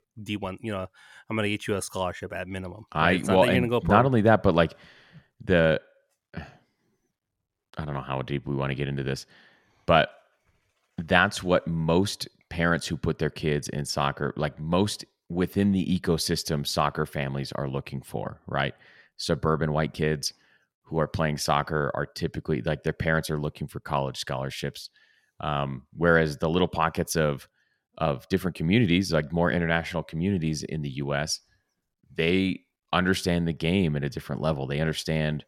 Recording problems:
none

